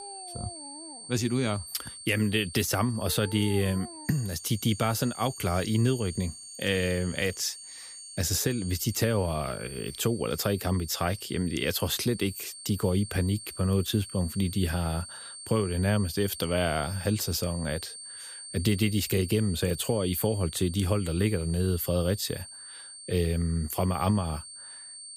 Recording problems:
high-pitched whine; noticeable; throughout; 8.5 kHz, 10 dB below the speech
animal sounds; noticeable; until 9 s; 20 dB below the speech

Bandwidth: 15 kHz